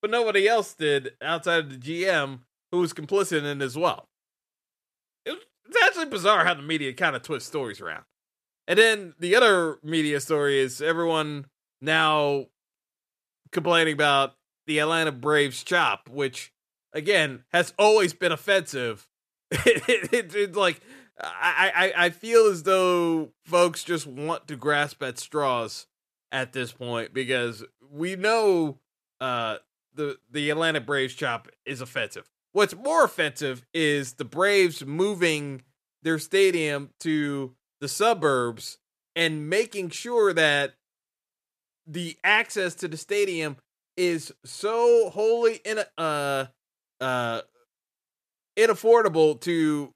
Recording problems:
none

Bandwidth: 14.5 kHz